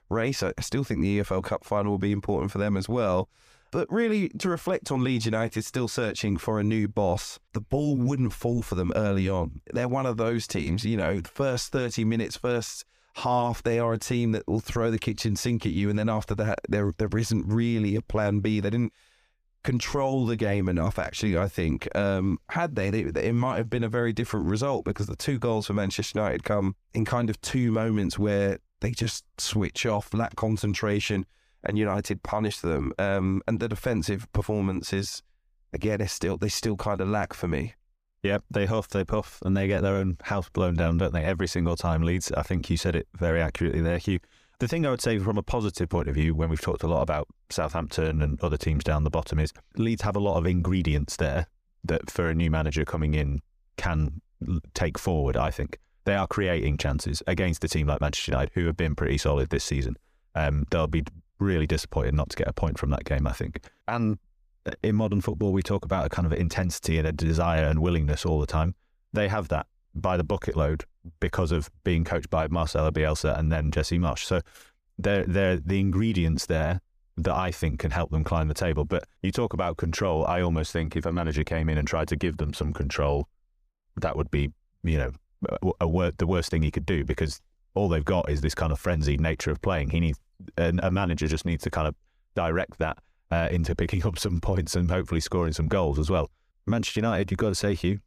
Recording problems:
none

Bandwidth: 15 kHz